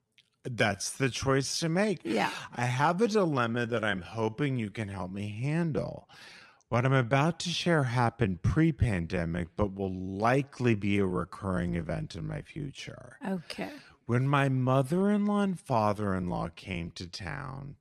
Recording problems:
wrong speed, natural pitch; too slow; 0.7 times normal speed

